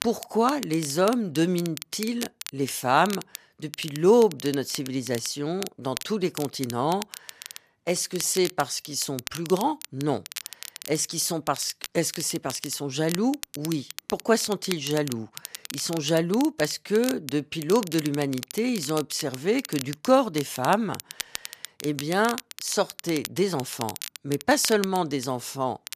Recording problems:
crackle, like an old record; noticeable; 10 dB below the speech

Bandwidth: 14.5 kHz